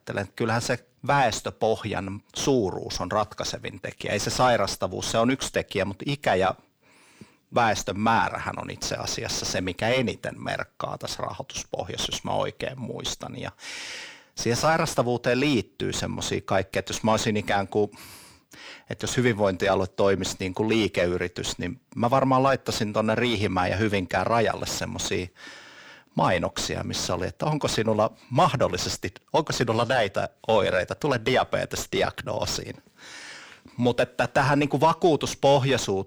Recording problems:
distortion; slight; 9 dB below the speech

